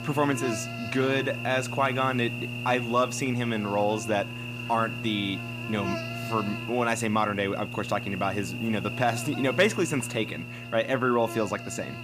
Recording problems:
electrical hum; loud; throughout; 60 Hz, 8 dB below the speech

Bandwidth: 15 kHz